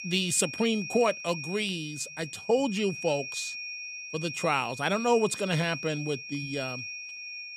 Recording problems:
high-pitched whine; loud; throughout; 2.5 kHz, 8 dB below the speech

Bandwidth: 14.5 kHz